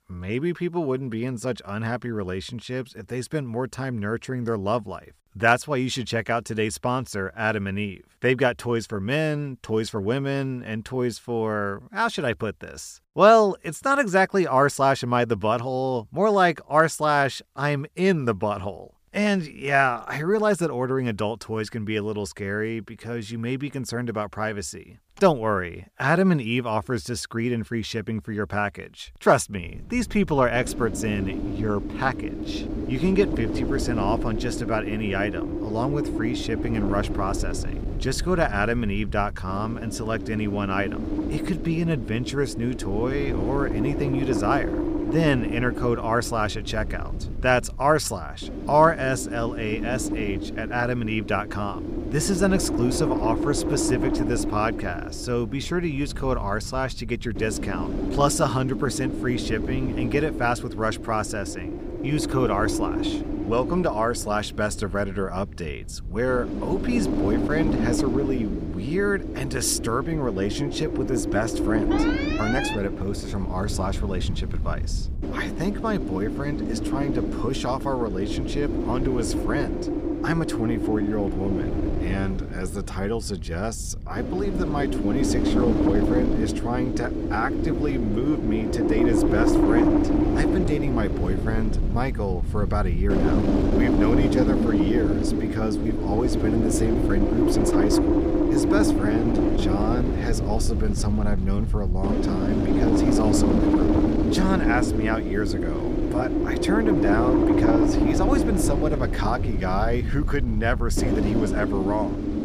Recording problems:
wind noise on the microphone; heavy; from 30 s on; 3 dB below the speech
alarm; noticeable; at 1:12; peak 2 dB below the speech
door banging; noticeable; at 1:44; peak 9 dB below the speech

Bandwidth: 15 kHz